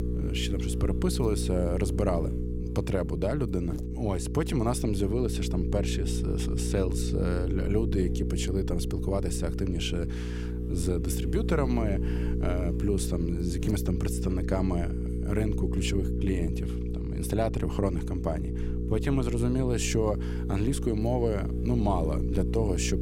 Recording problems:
electrical hum; loud; throughout; 60 Hz, 6 dB below the speech

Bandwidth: 16 kHz